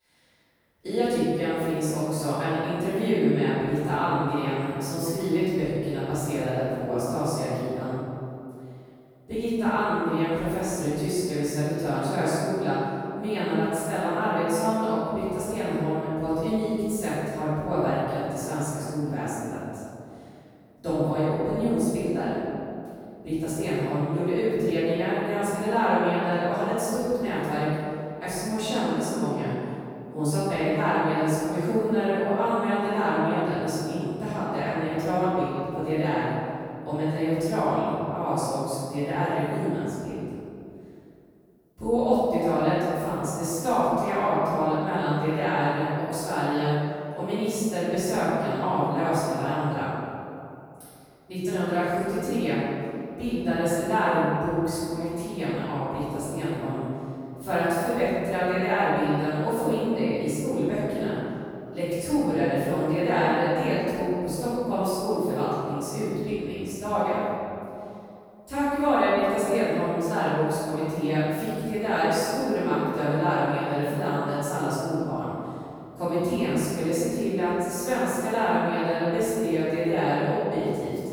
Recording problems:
room echo; strong; dies away in 2.4 s
off-mic speech; far

